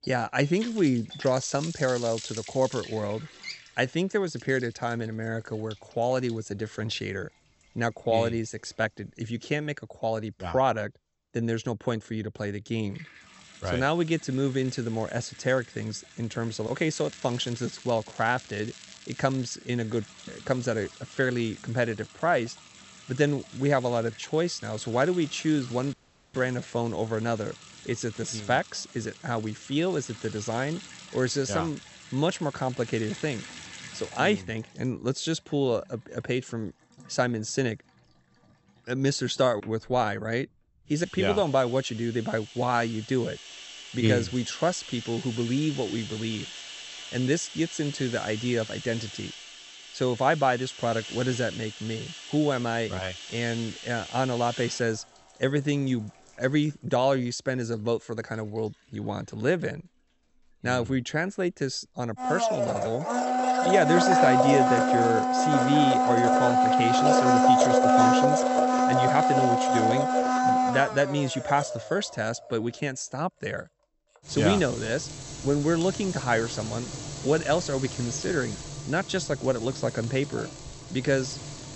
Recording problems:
high frequencies cut off; noticeable; nothing above 8 kHz
household noises; very loud; throughout; 1 dB above the speech
crackling; noticeable; from 17 to 20 s and from 1:08 to 1:10; 20 dB below the speech
audio cutting out; at 26 s

